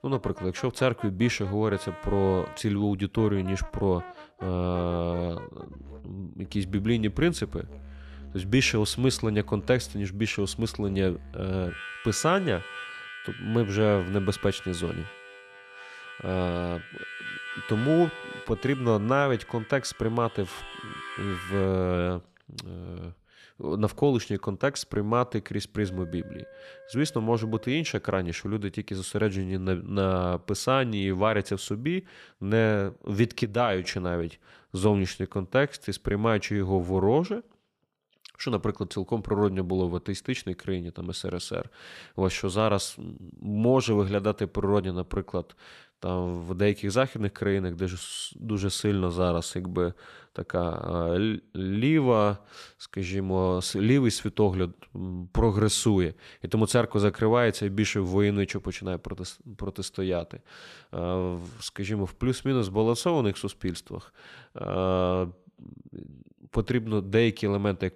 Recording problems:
background music; noticeable; until 29 s; 15 dB below the speech

